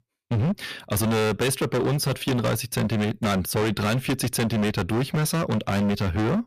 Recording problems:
distortion; heavy; 30% of the sound clipped

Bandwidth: 14.5 kHz